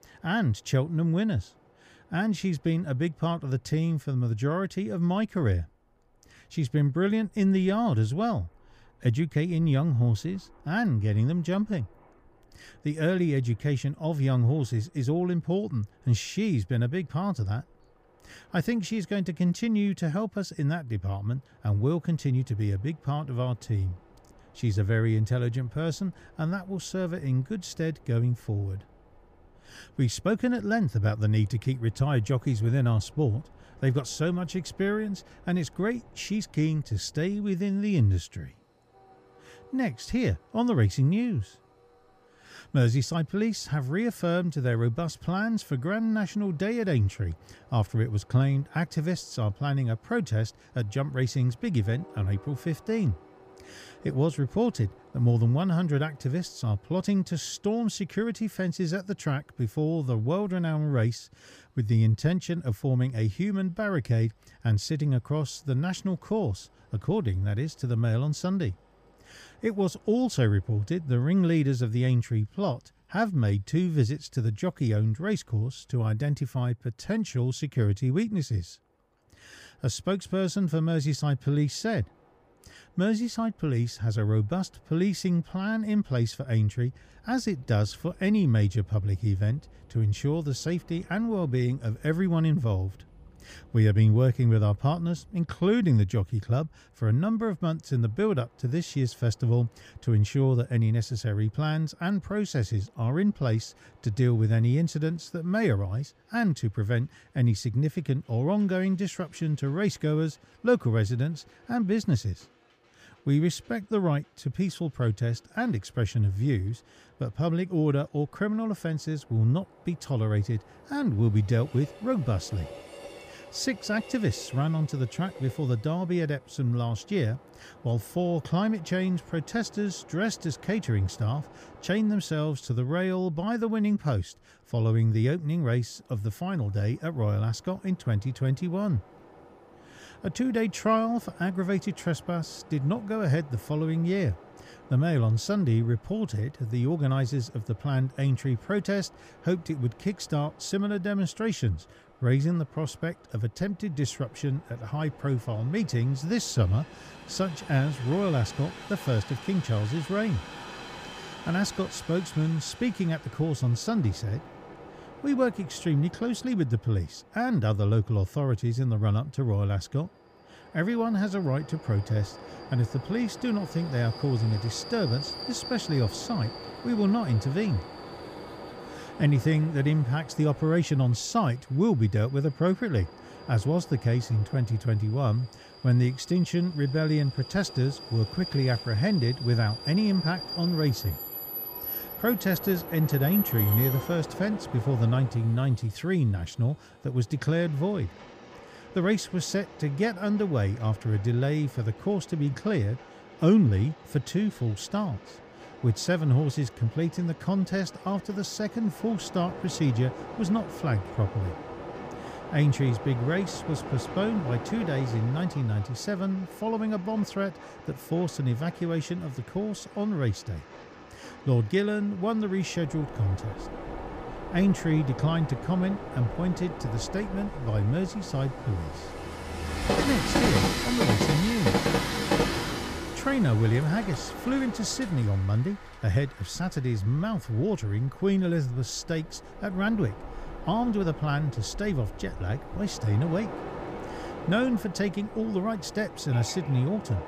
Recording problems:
train or aircraft noise; noticeable; throughout; 10 dB below the speech

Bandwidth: 15 kHz